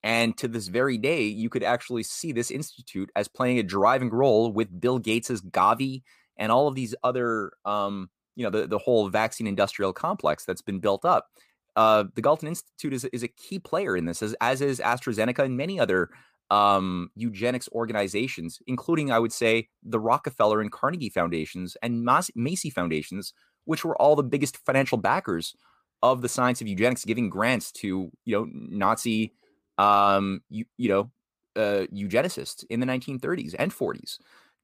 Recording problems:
none

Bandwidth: 15 kHz